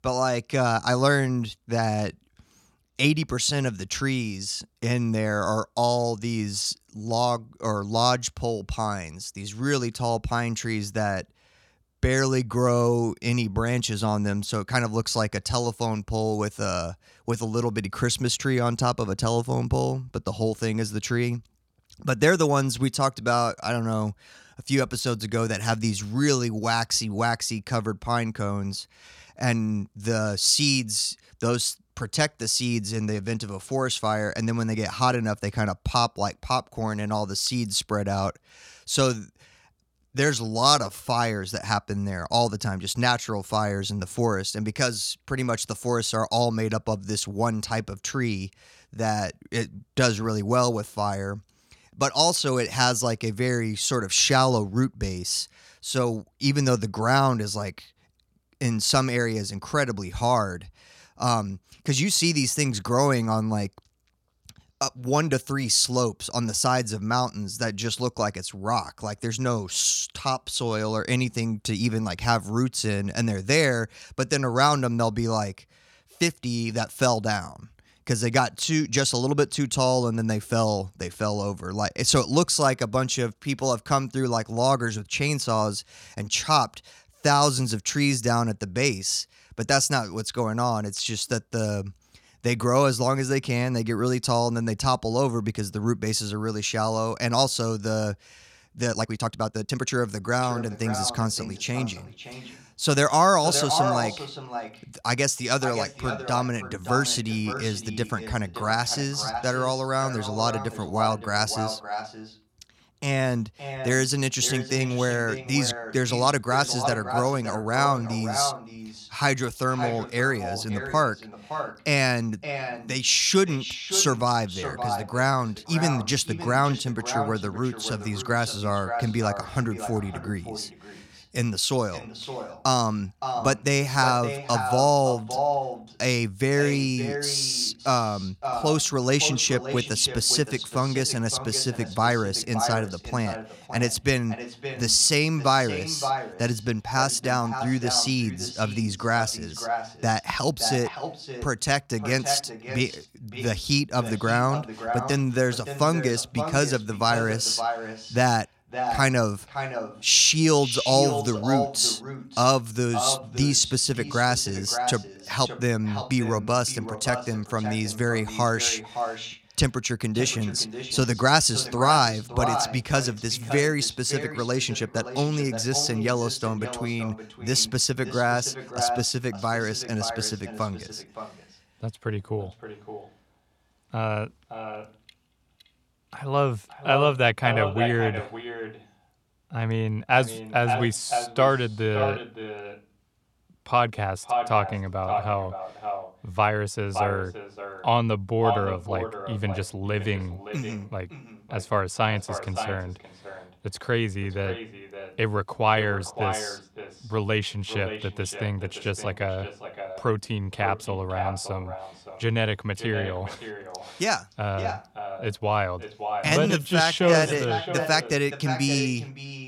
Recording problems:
echo of what is said; strong; from 1:40 on; 570 ms later, 9 dB below the speech
uneven, jittery; strongly; from 40 s to 3:37

